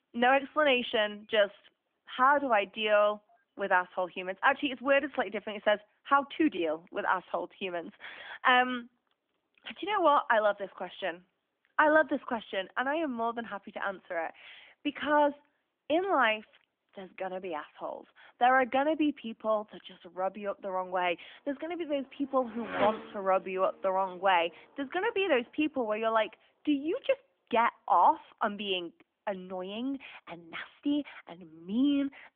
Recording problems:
phone-call audio; nothing above 3 kHz
traffic noise; very faint; throughout; 10 dB below the speech

